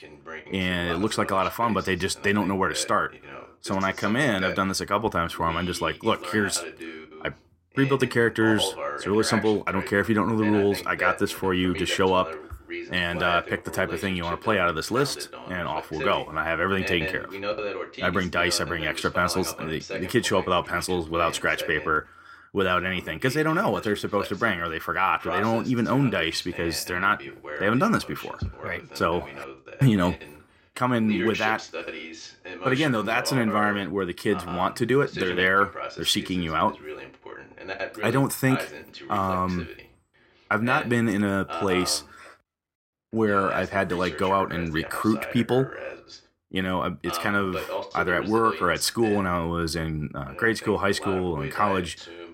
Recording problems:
voice in the background; noticeable; throughout; 10 dB below the speech

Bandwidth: 16 kHz